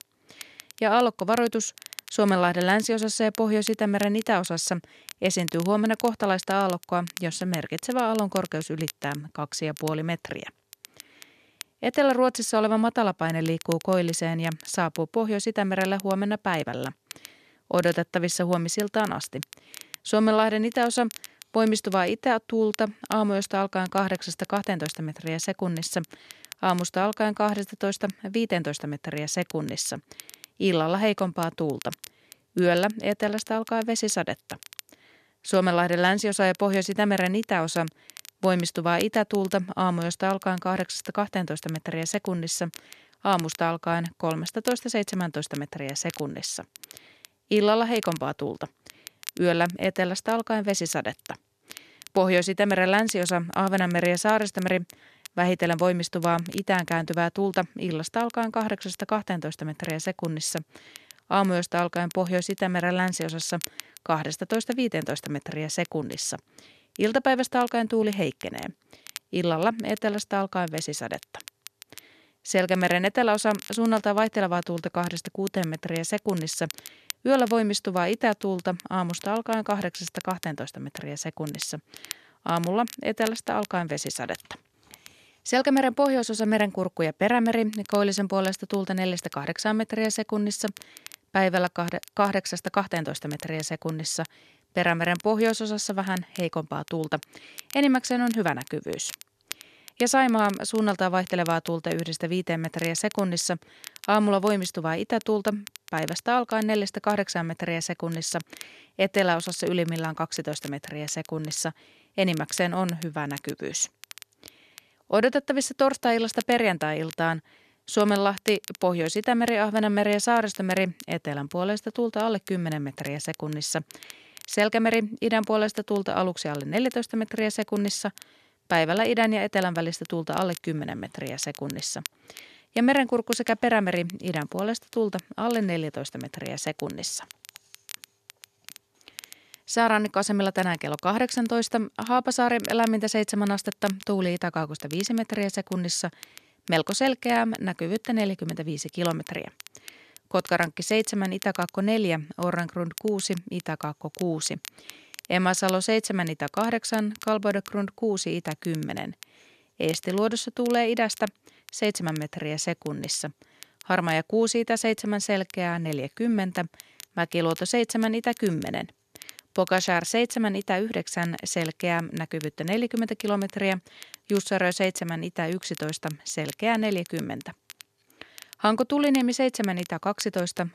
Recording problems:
crackle, like an old record; noticeable; 20 dB below the speech

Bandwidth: 14 kHz